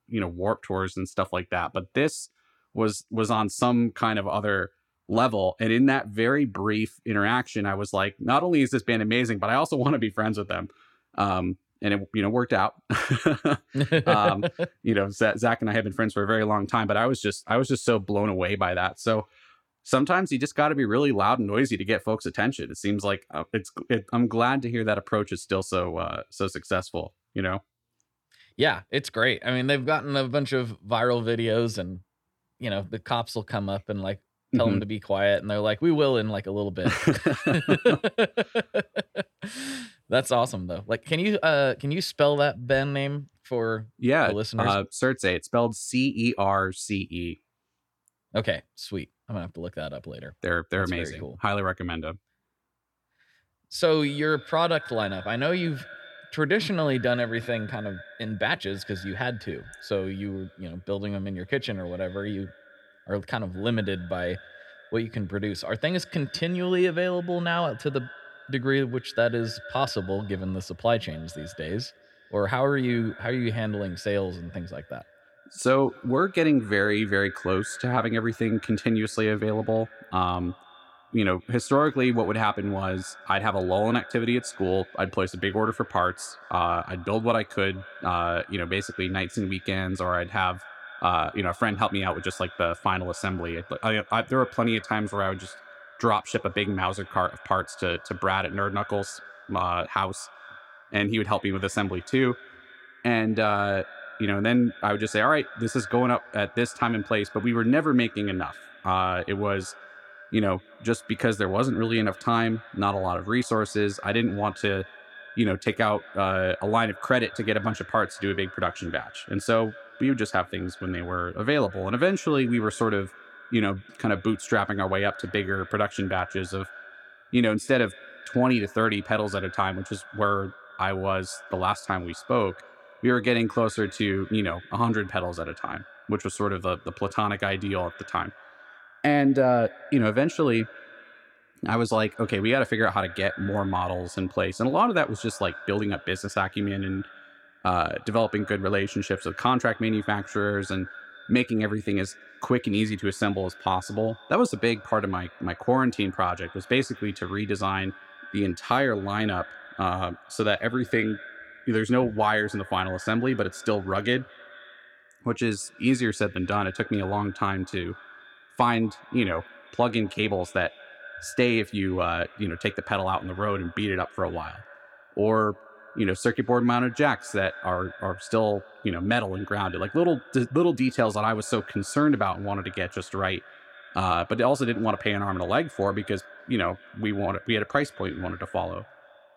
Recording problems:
echo of what is said; faint; from 54 s on; 220 ms later, 20 dB below the speech

